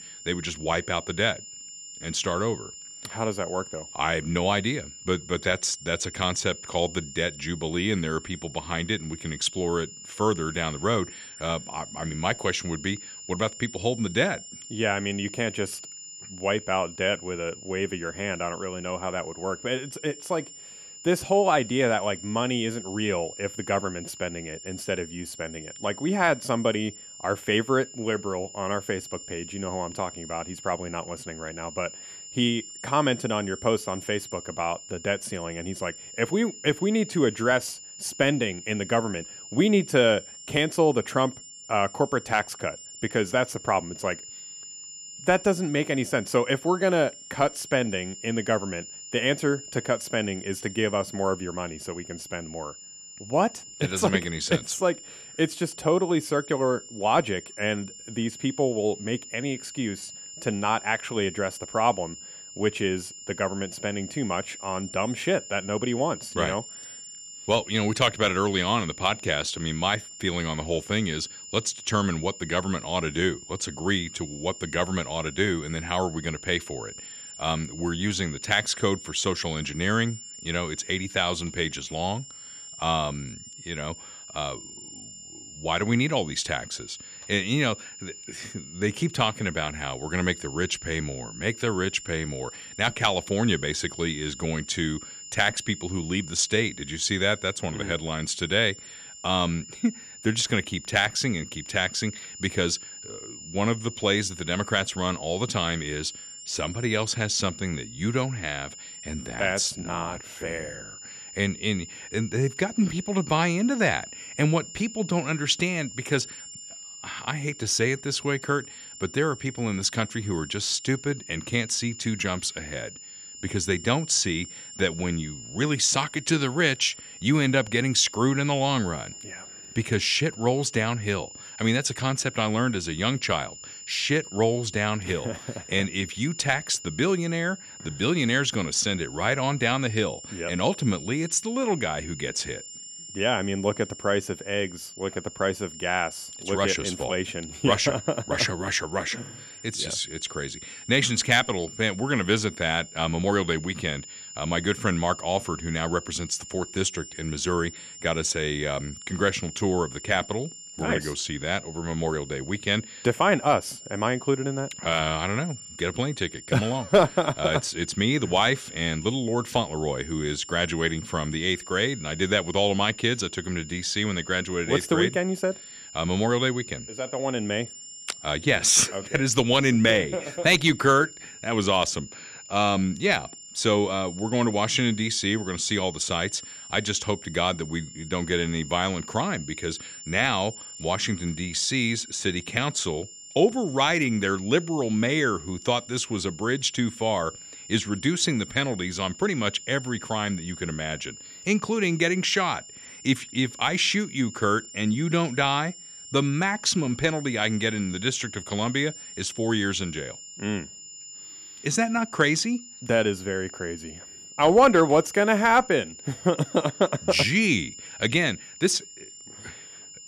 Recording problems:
high-pitched whine; noticeable; throughout; 7 kHz, 15 dB below the speech

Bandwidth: 14.5 kHz